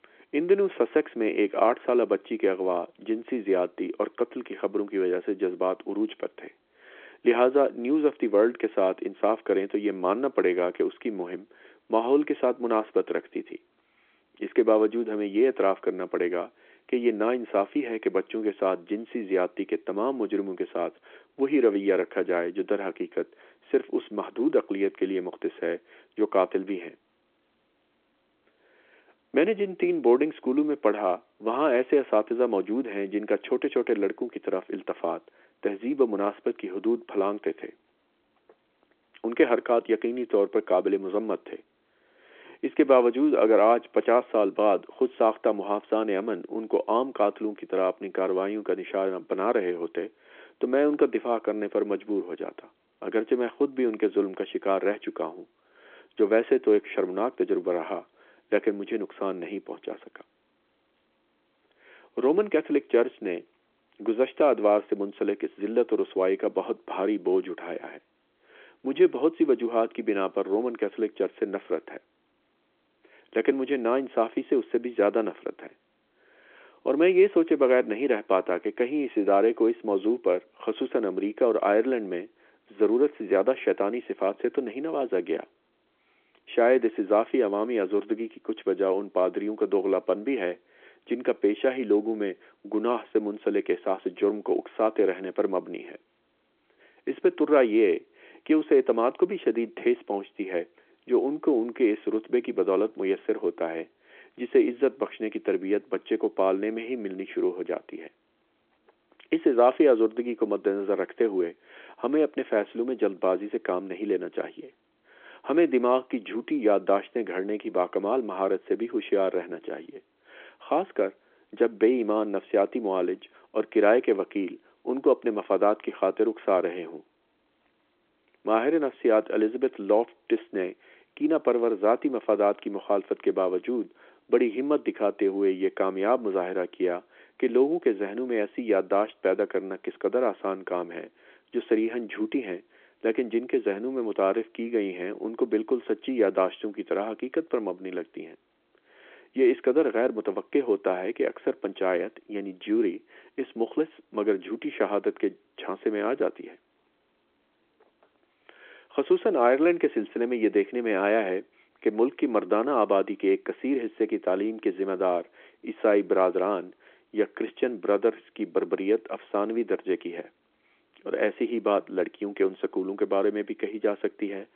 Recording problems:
phone-call audio

